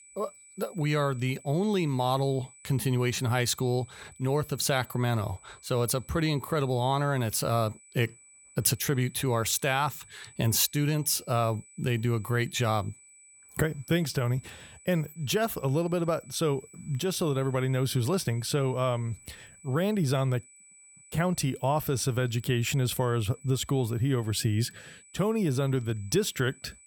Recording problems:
high-pitched whine; faint; throughout; 8 kHz, 25 dB below the speech

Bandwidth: 18 kHz